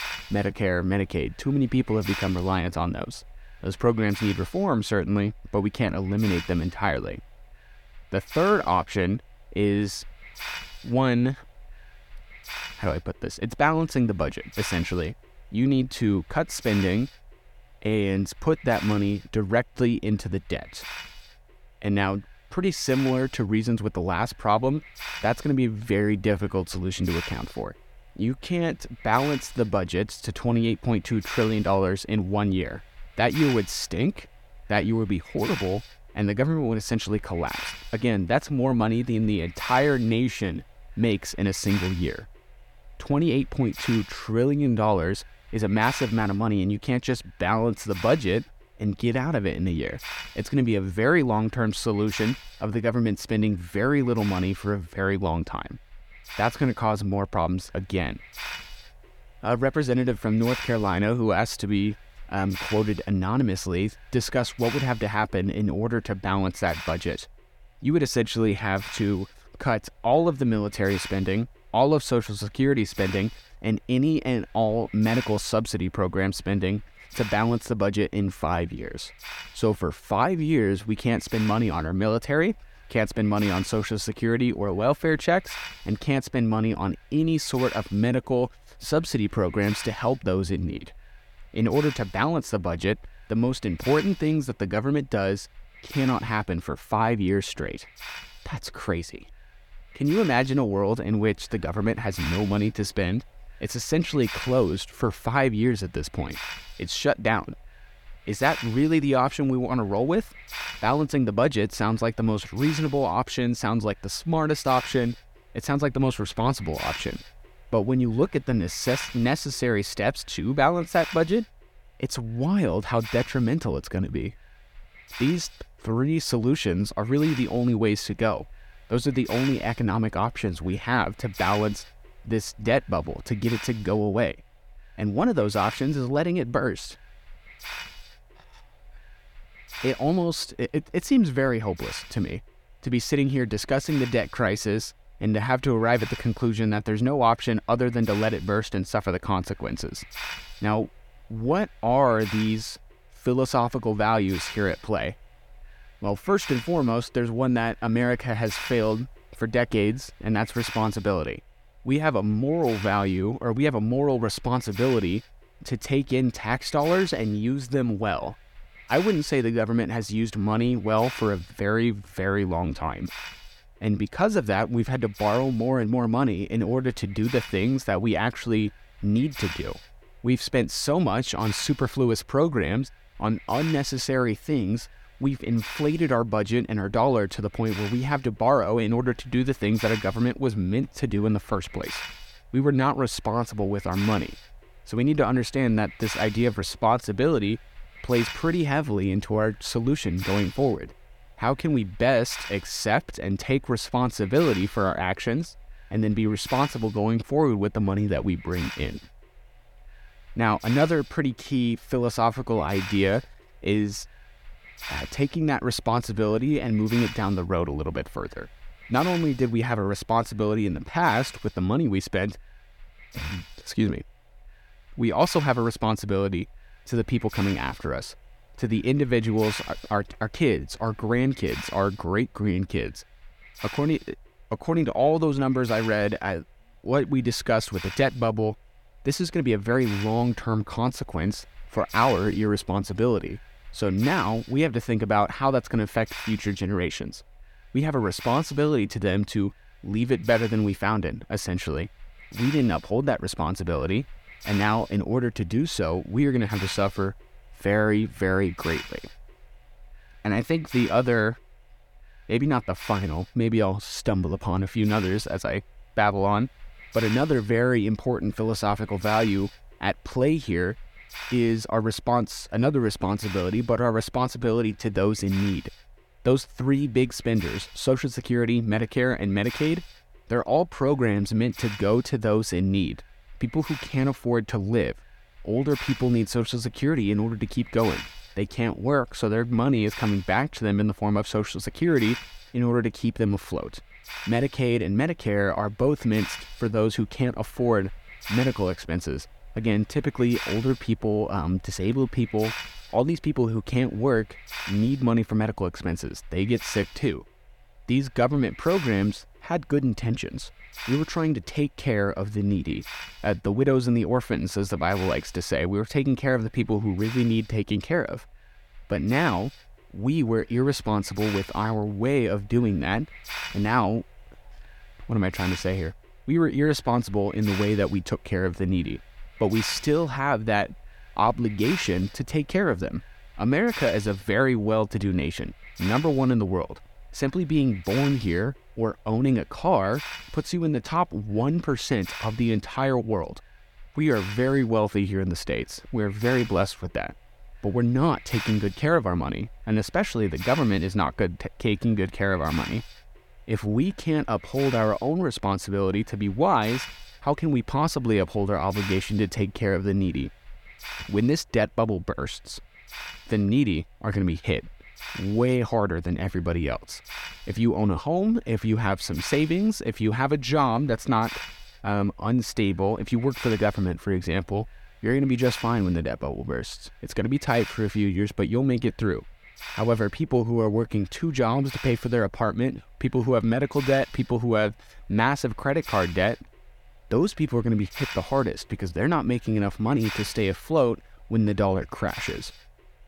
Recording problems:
hiss; noticeable; throughout; 15 dB below the speech

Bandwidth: 17.5 kHz